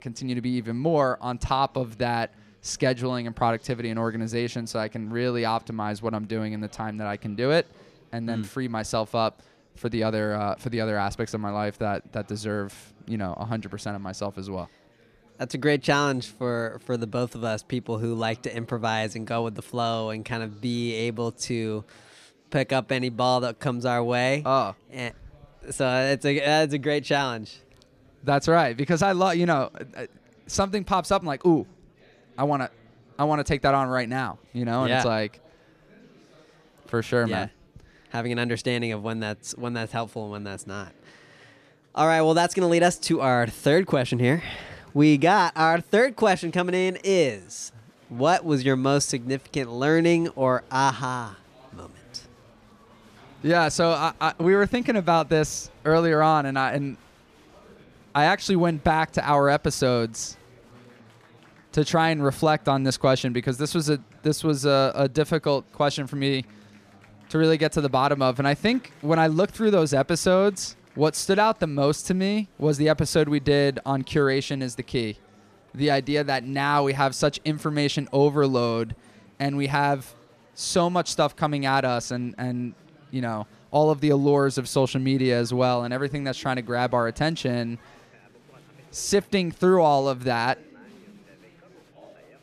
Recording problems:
murmuring crowd; faint; throughout; 30 dB below the speech

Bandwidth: 14.5 kHz